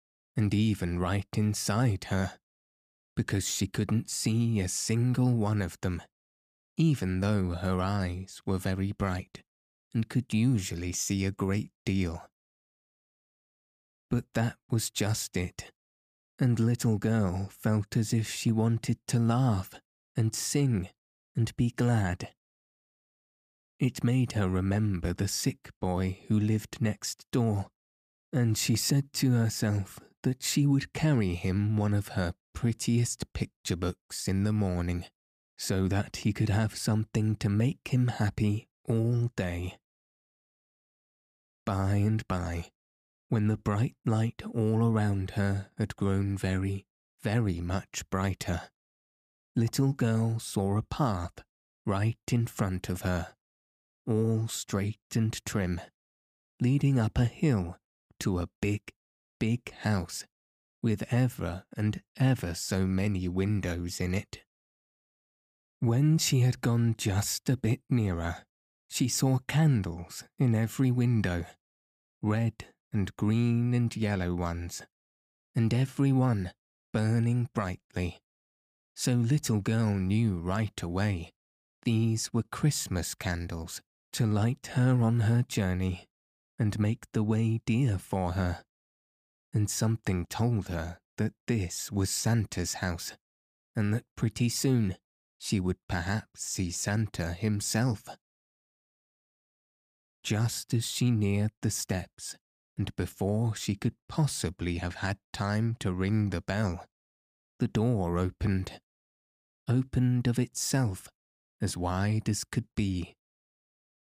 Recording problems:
none

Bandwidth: 15 kHz